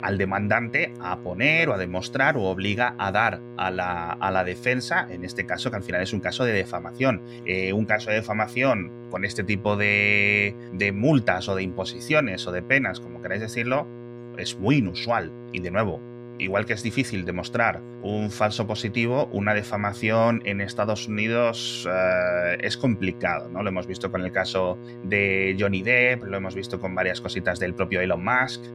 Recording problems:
electrical hum; noticeable; throughout; 60 Hz, 20 dB below the speech

